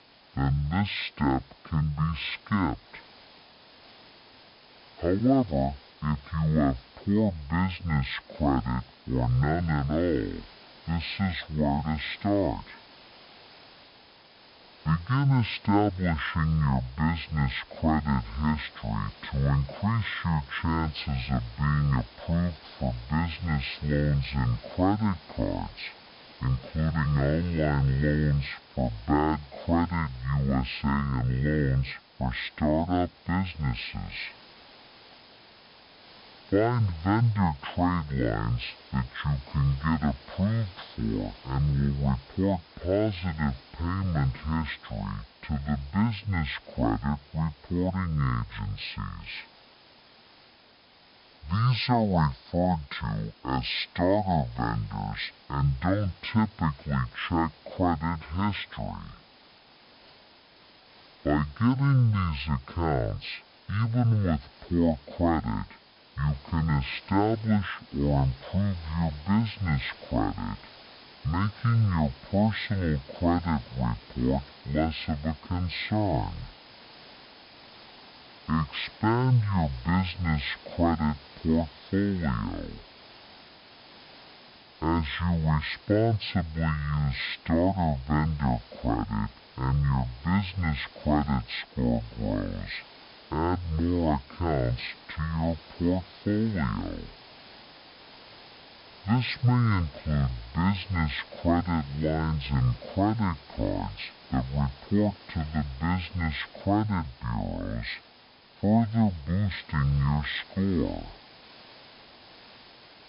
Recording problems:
wrong speed and pitch; too slow and too low; 0.5 times normal speed
high frequencies cut off; noticeable; nothing above 5.5 kHz
hiss; faint; throughout; 20 dB below the speech

